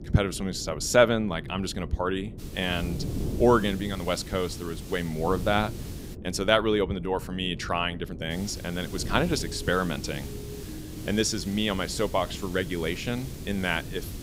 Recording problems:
wind noise on the microphone; occasional gusts; 20 dB below the speech
hiss; noticeable; from 2.5 to 6 s and from 8.5 s on; 20 dB below the speech
siren; faint; from 9.5 to 11 s; peak 15 dB below the speech

